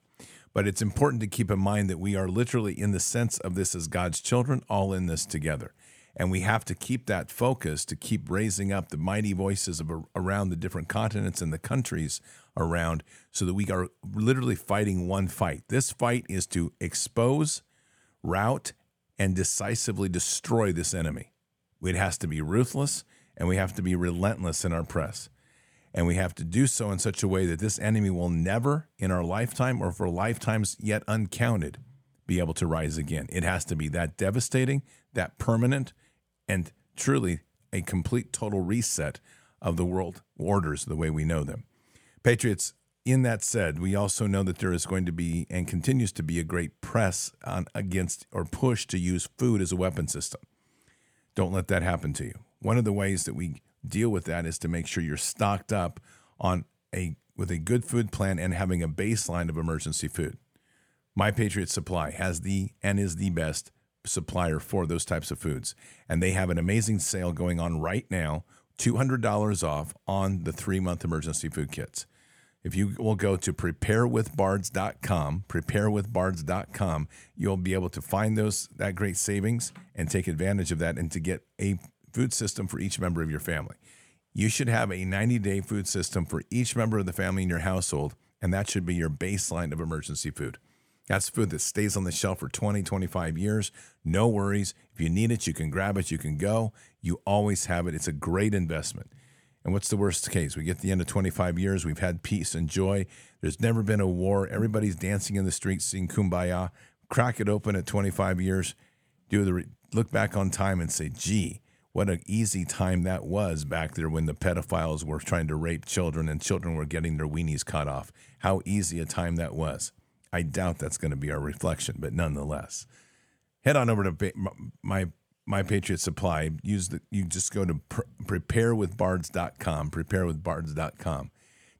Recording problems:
none

